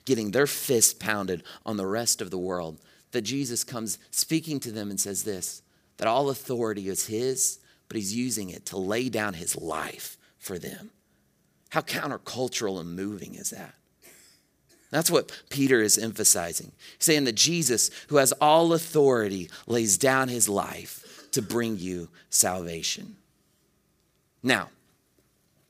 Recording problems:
none

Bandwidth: 15 kHz